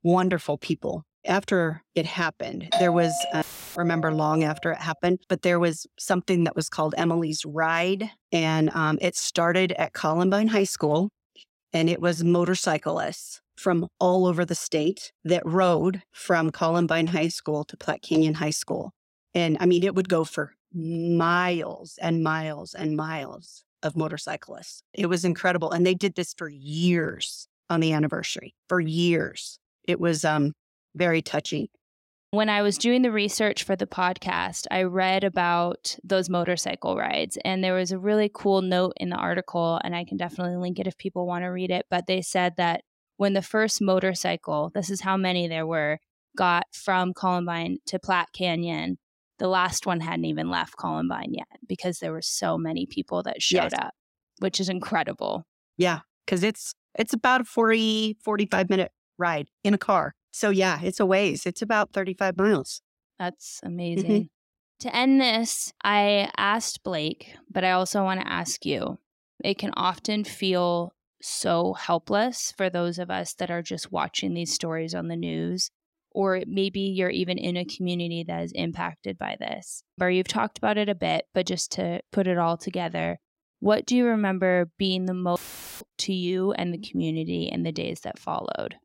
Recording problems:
doorbell; loud; from 2.5 to 4.5 s; peak 1 dB above the speech
audio cutting out; filled with static; at 3.5 s and at 1:25

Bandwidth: 16 kHz